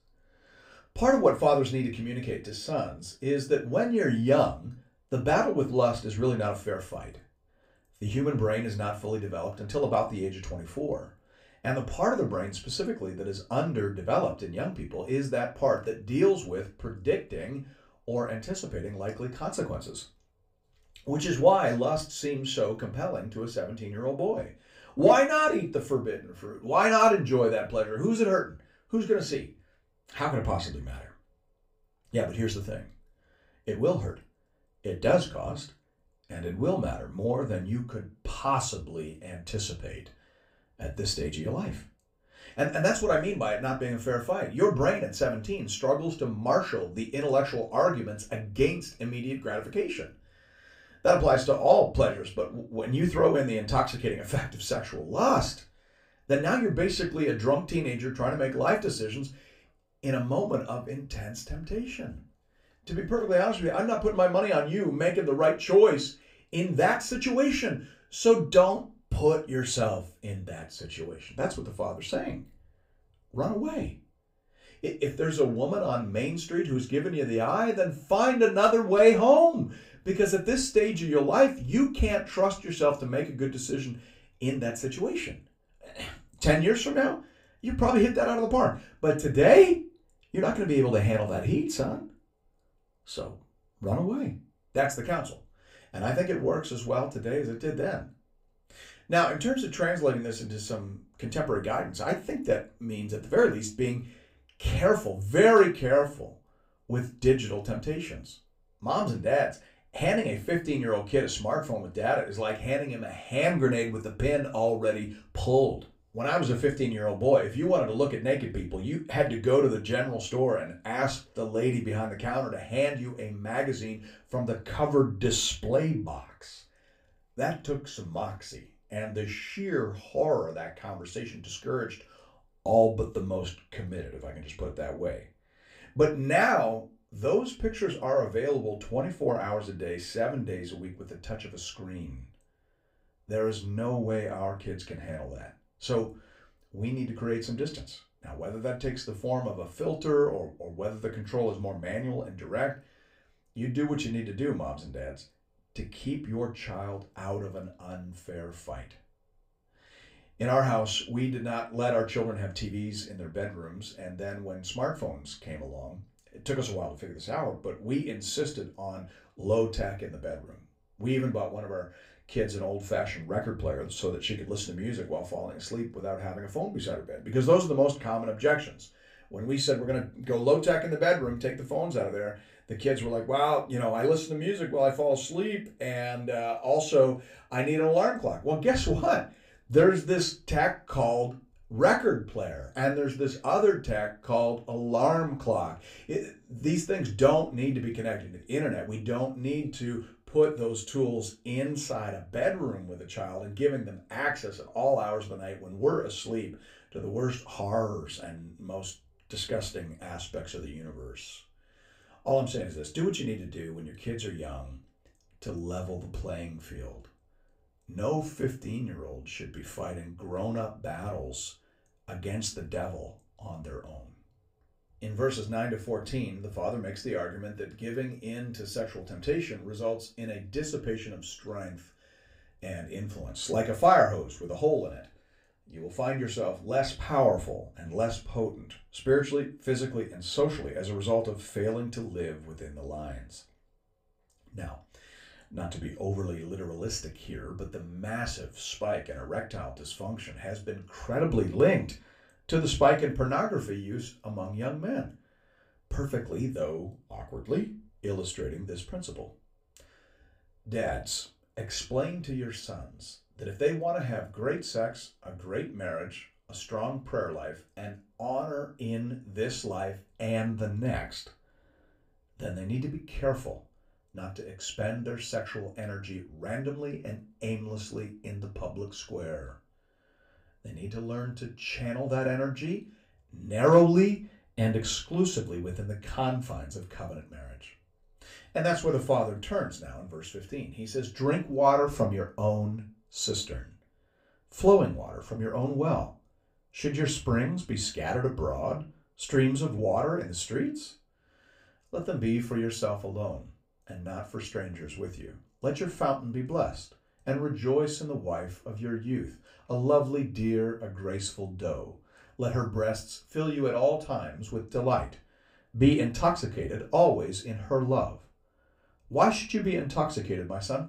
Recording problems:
room echo; very slight; dies away in 0.2 s
off-mic speech; somewhat distant

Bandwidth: 15.5 kHz